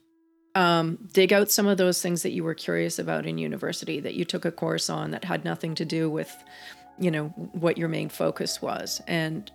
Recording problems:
background music; faint; throughout; 30 dB below the speech

